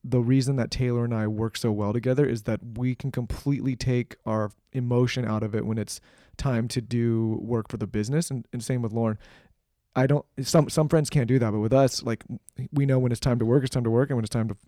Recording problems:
none

